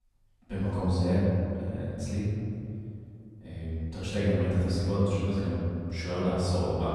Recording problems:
room echo; strong; dies away in 2.6 s
off-mic speech; far

